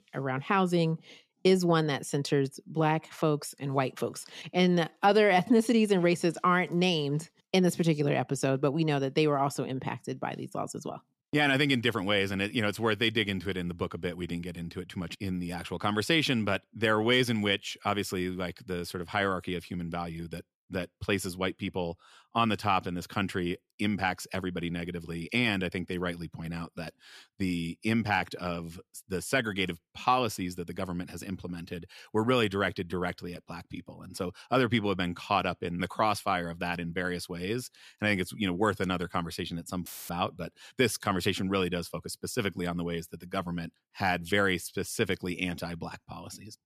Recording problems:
audio cutting out; filled with static; at 40 s

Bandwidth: 14.5 kHz